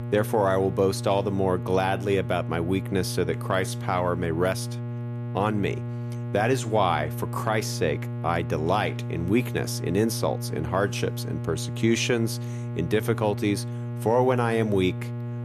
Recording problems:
electrical hum; noticeable; throughout; 60 Hz, 15 dB below the speech

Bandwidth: 14.5 kHz